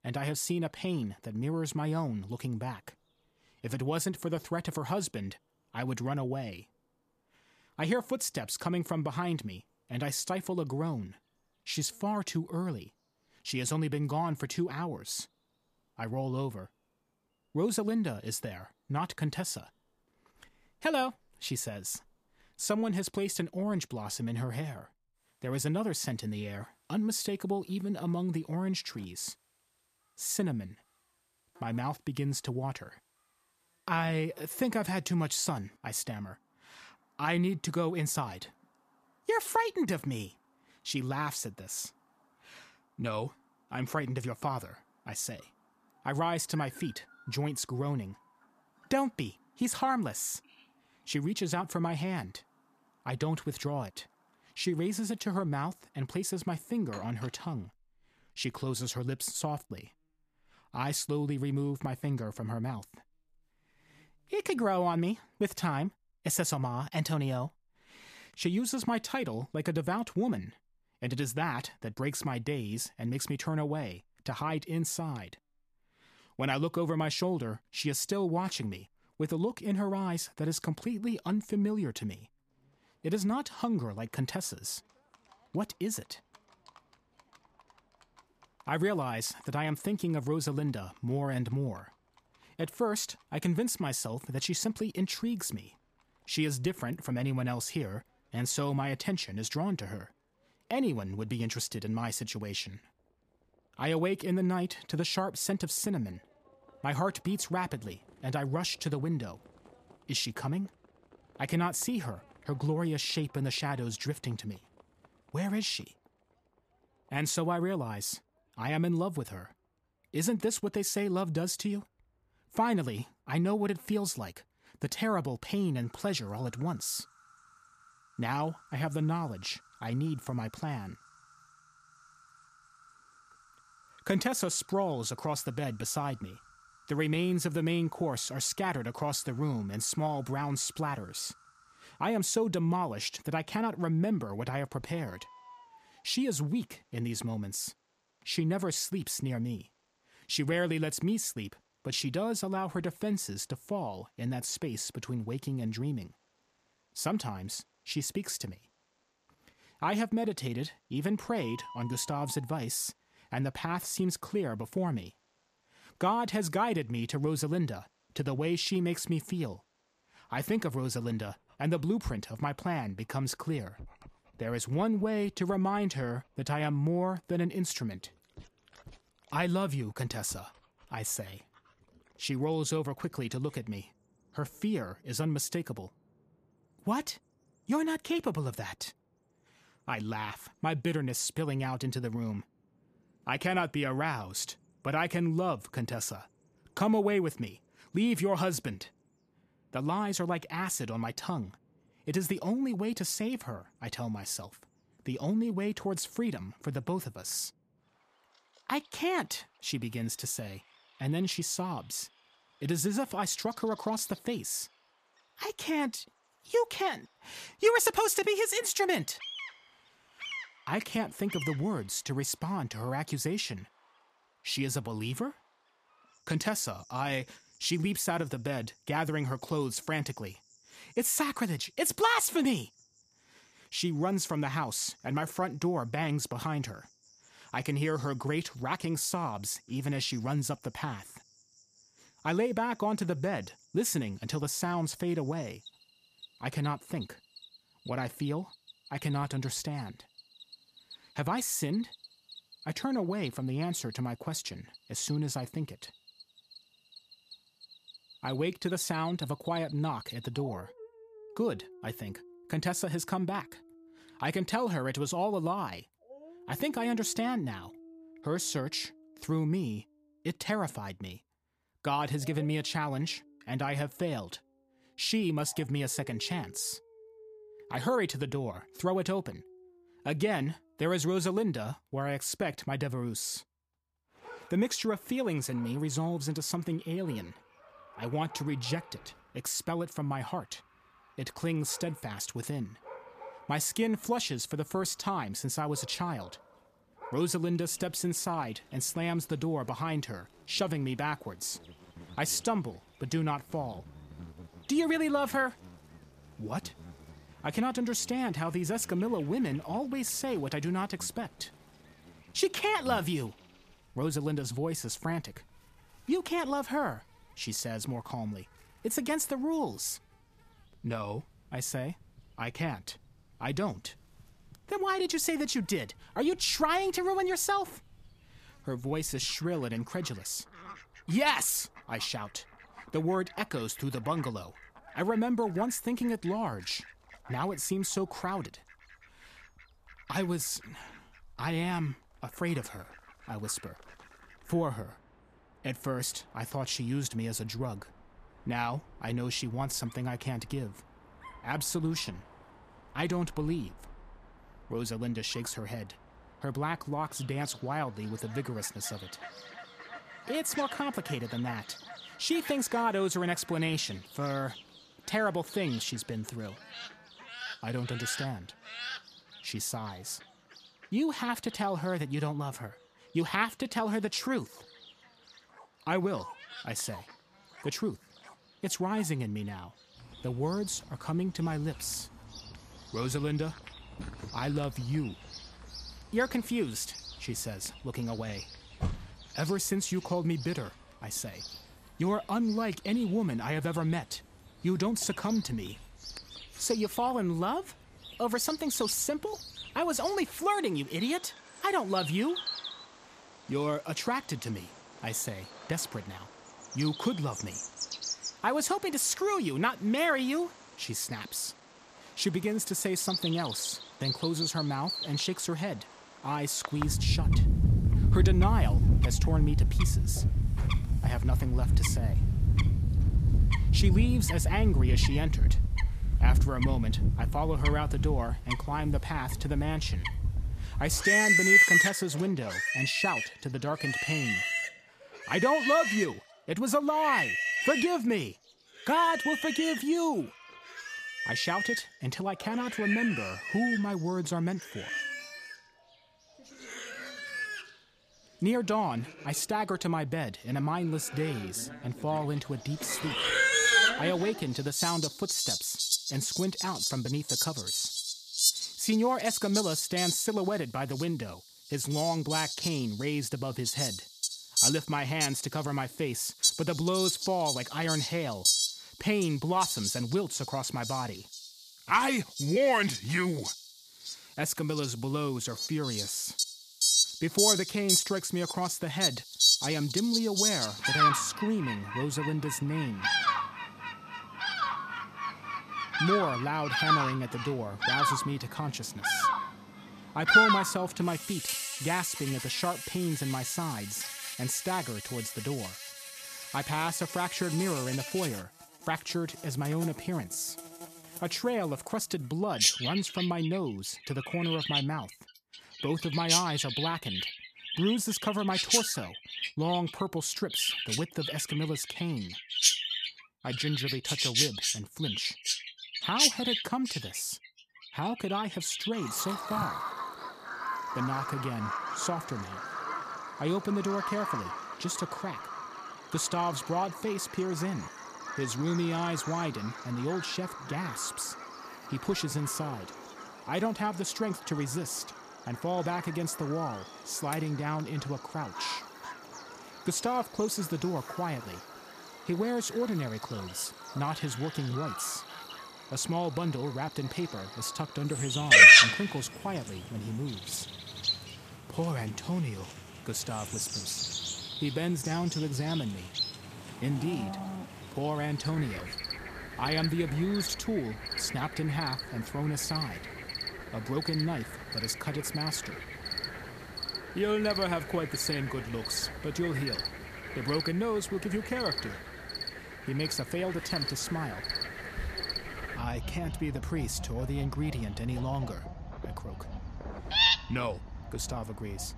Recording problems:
animal sounds; very loud; throughout; 2 dB above the speech

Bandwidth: 14.5 kHz